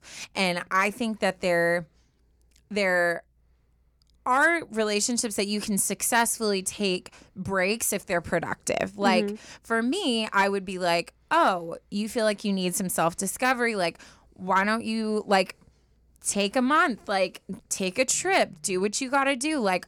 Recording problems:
none

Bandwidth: 18.5 kHz